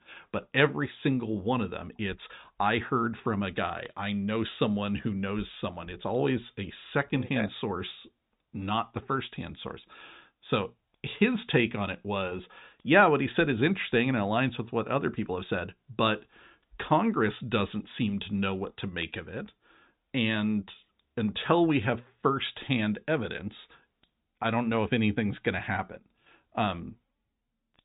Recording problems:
high frequencies cut off; severe; nothing above 4 kHz

